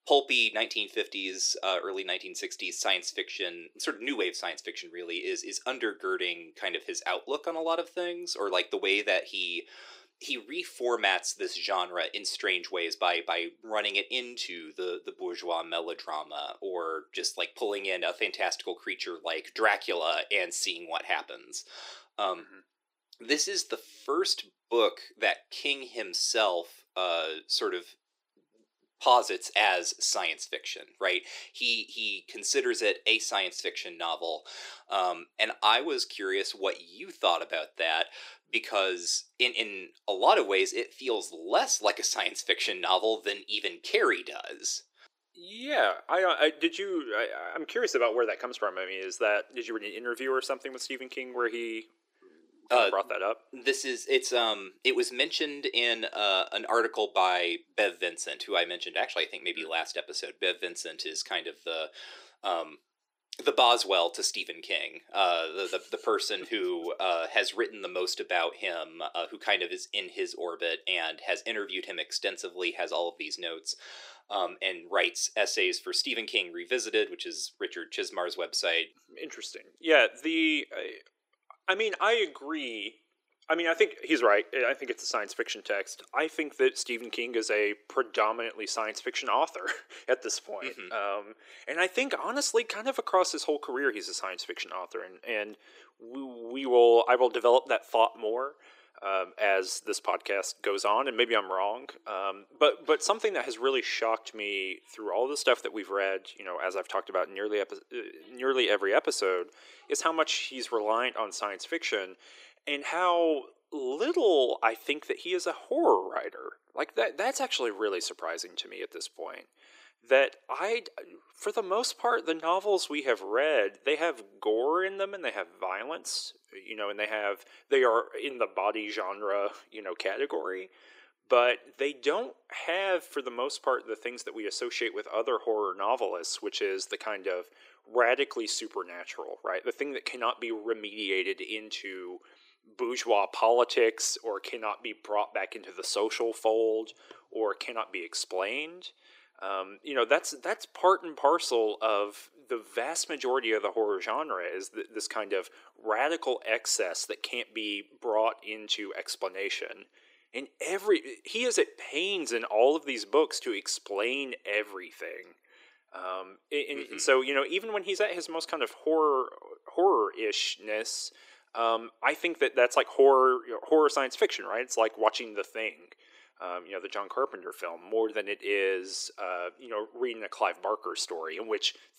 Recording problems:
thin; very; fading below 350 Hz

